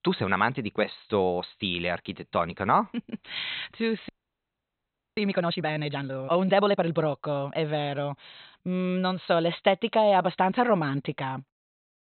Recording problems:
high frequencies cut off; severe; nothing above 4 kHz
audio freezing; at 4 s for 1 s

